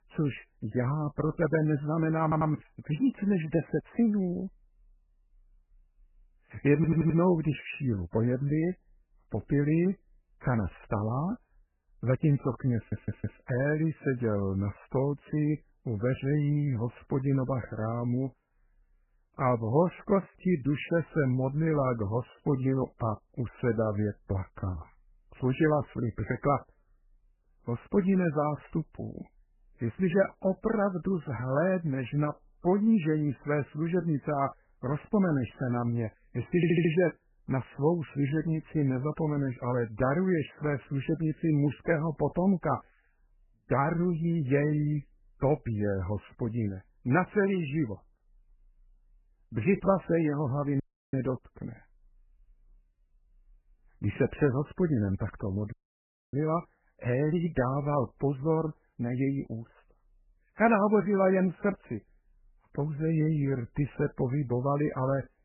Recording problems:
garbled, watery; badly; nothing above 3 kHz
audio stuttering; 4 times, first at 2 s
audio cutting out; at 51 s and at 56 s for 0.5 s

